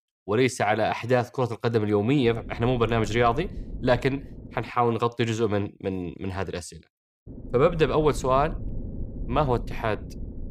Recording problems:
low rumble; faint; from 2 to 4.5 s and from 7.5 s on; 20 dB below the speech

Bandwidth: 15 kHz